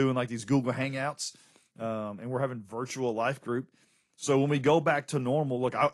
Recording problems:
garbled, watery; slightly; nothing above 11 kHz
abrupt cut into speech; at the start

